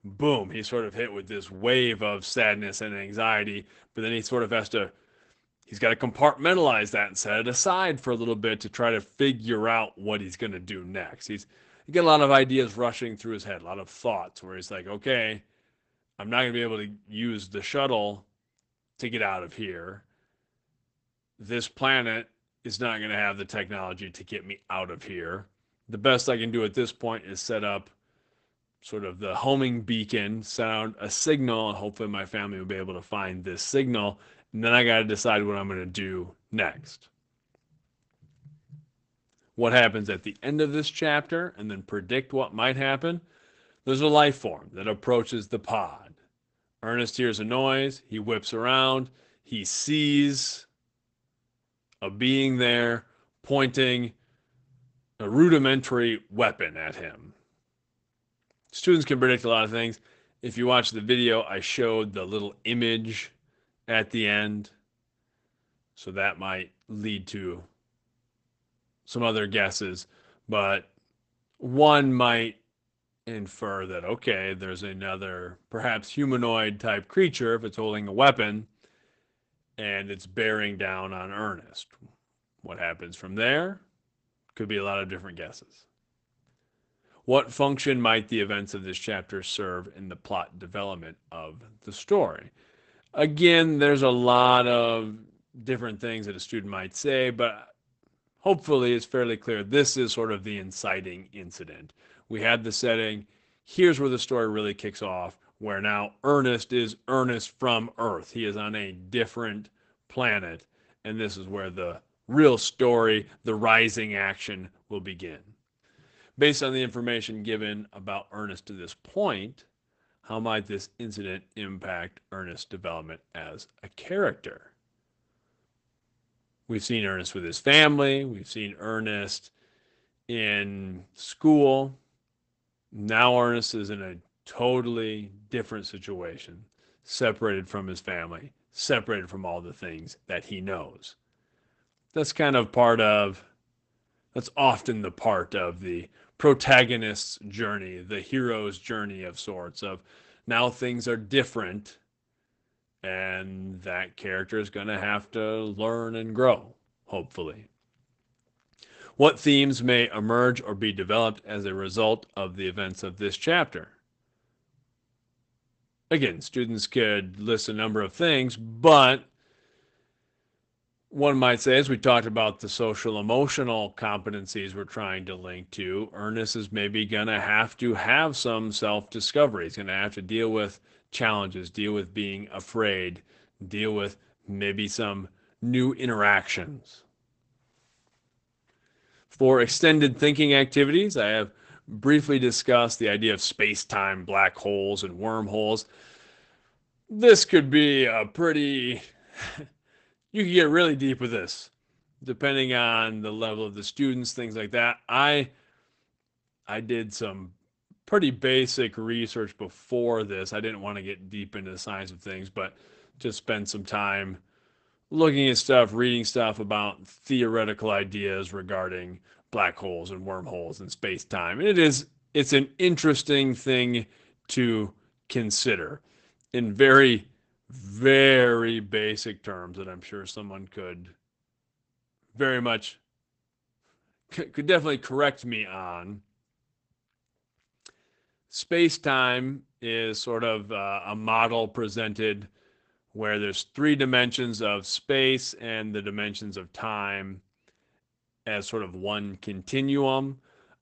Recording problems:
garbled, watery; badly; nothing above 8 kHz

